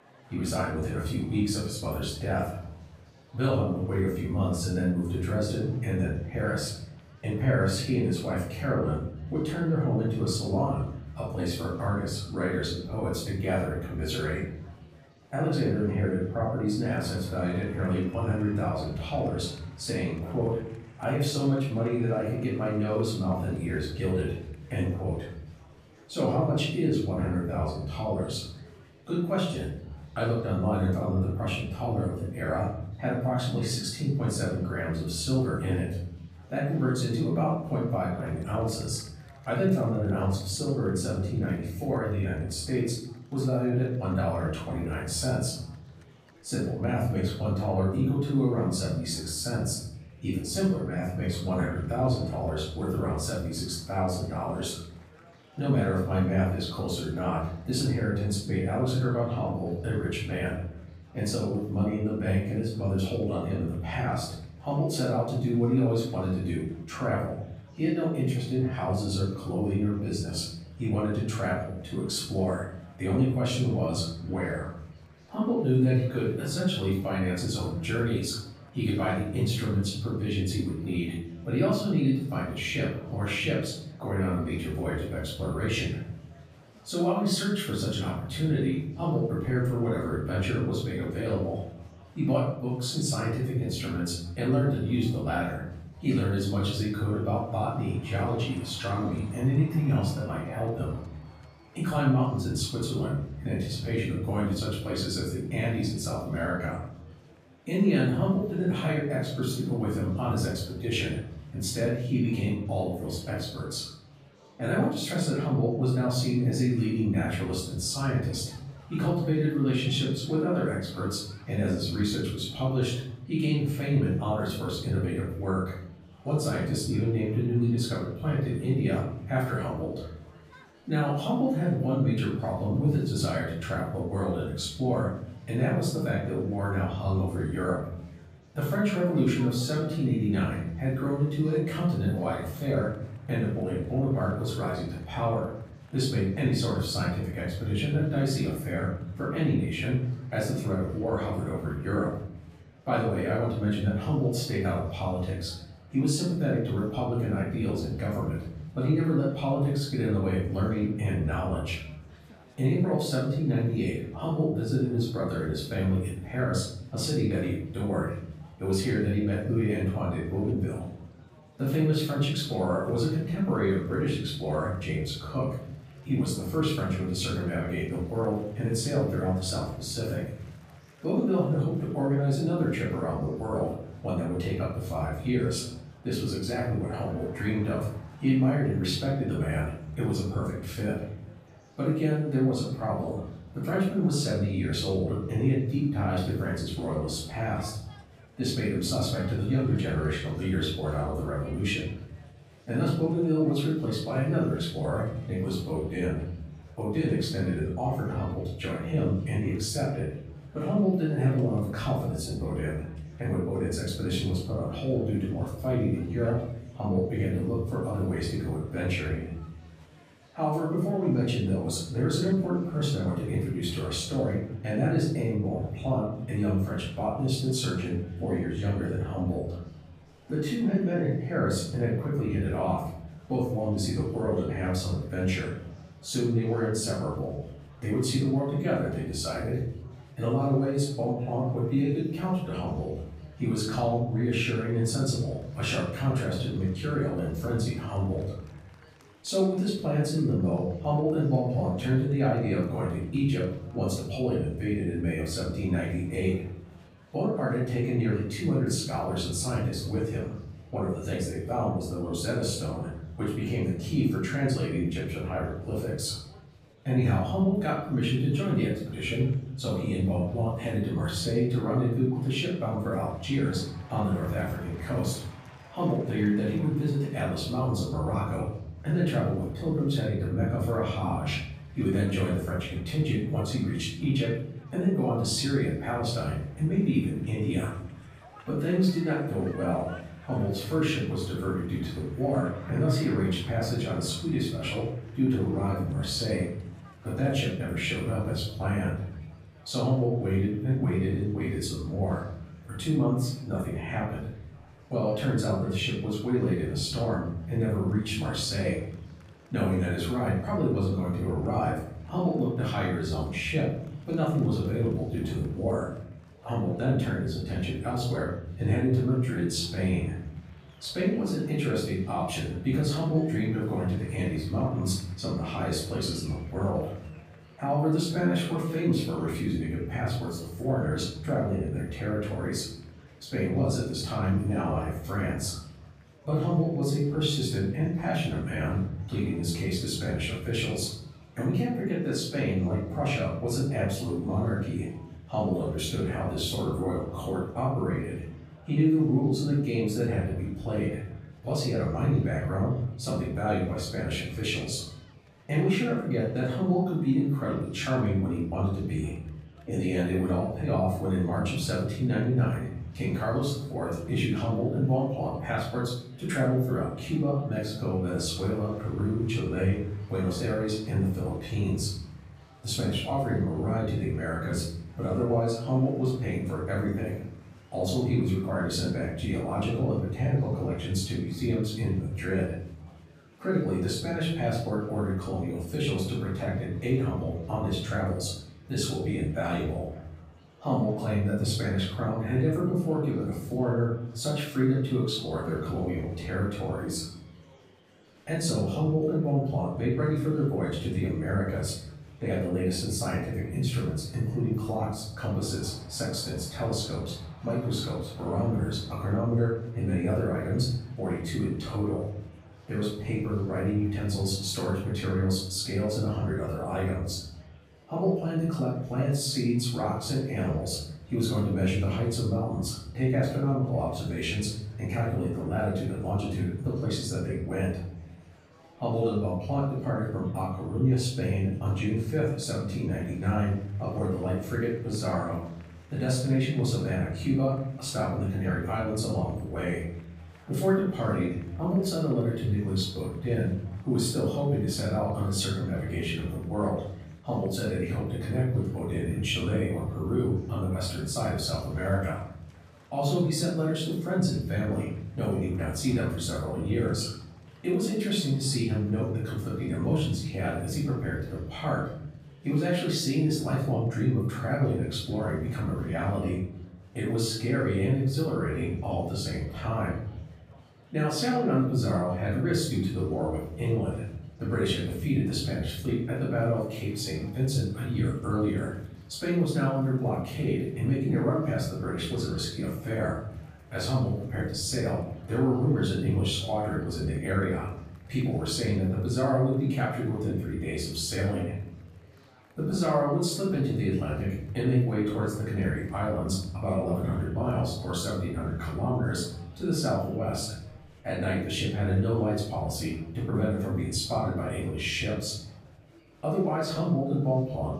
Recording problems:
off-mic speech; far
room echo; noticeable; dies away in 0.9 s
murmuring crowd; faint; throughout; 25 dB below the speech

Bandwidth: 14.5 kHz